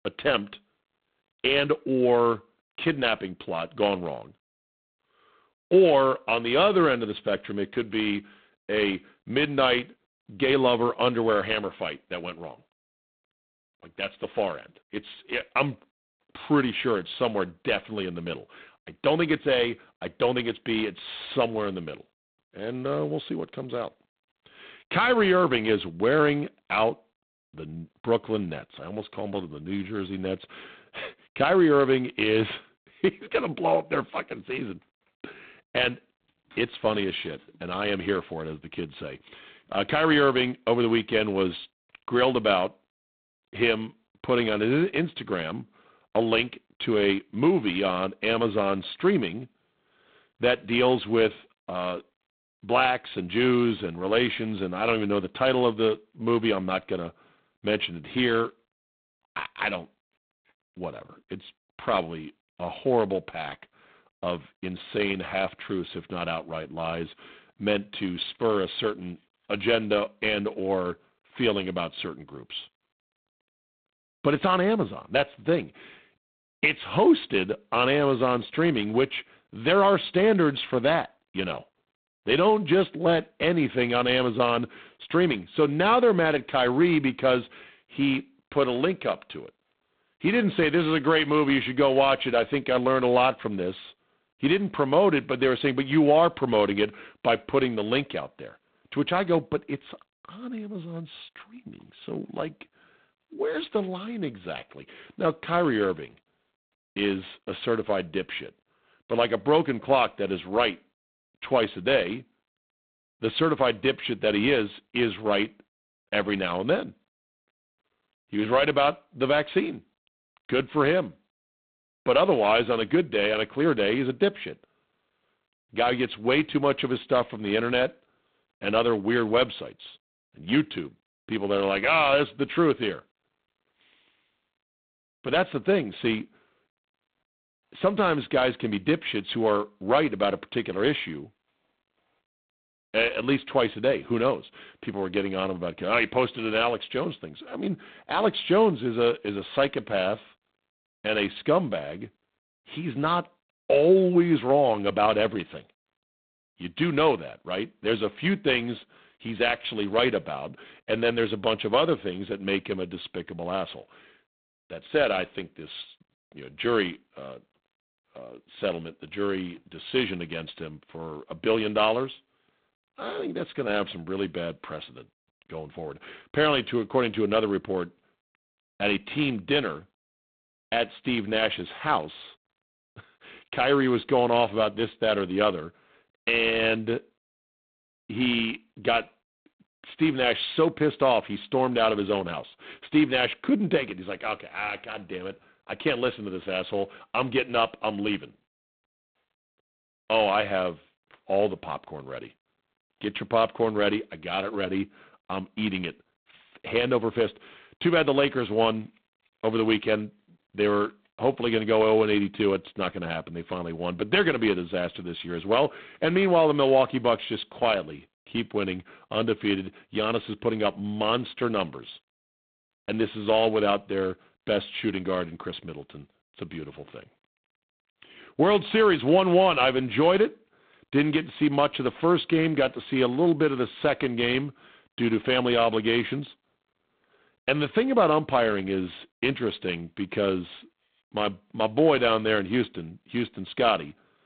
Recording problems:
phone-call audio; poor line; nothing above 3.5 kHz

